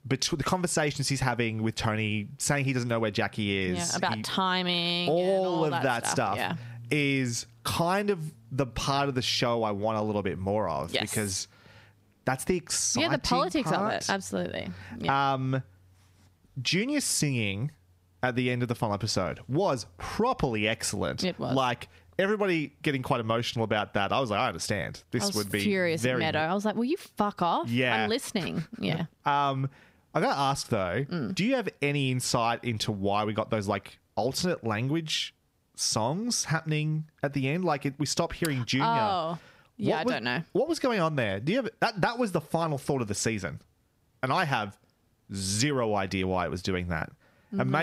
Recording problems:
squashed, flat; somewhat
abrupt cut into speech; at the end

